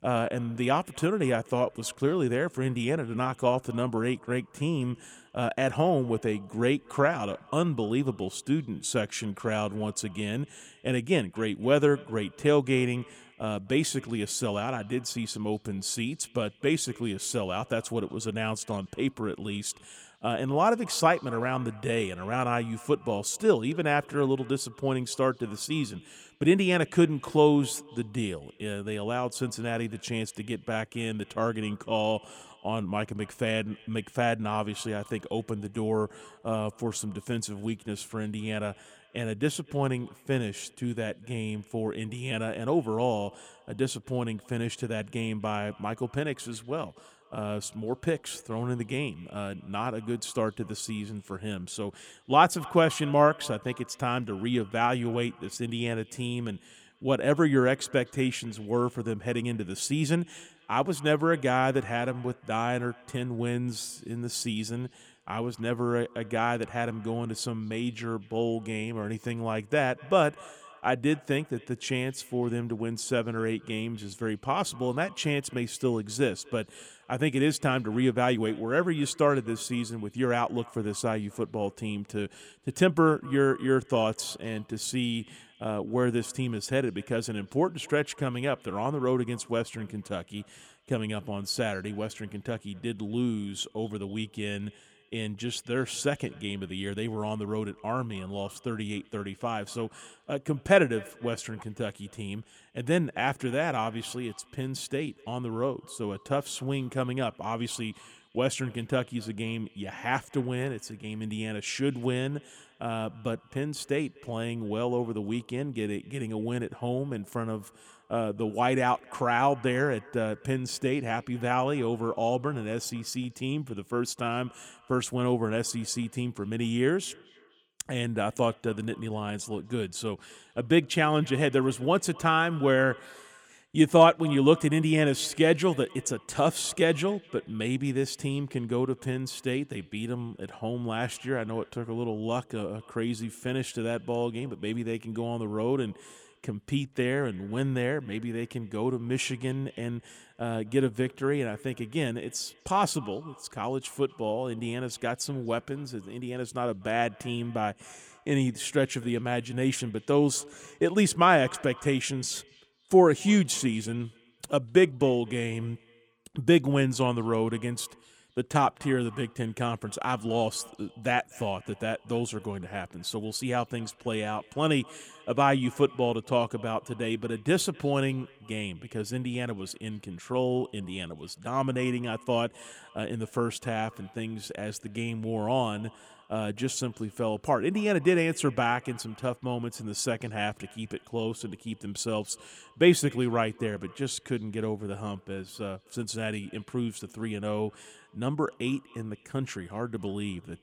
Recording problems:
echo of what is said; faint; throughout; 250 ms later, 25 dB below the speech

